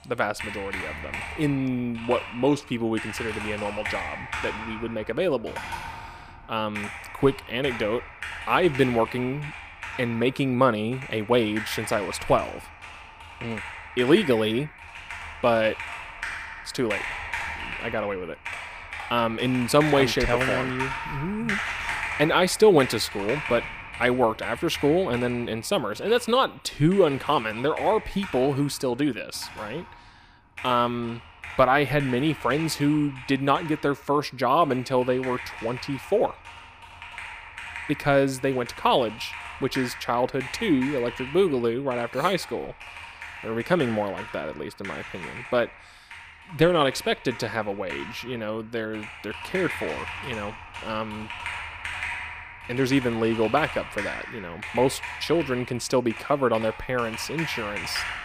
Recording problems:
household noises; loud; throughout; 10 dB below the speech

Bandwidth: 15 kHz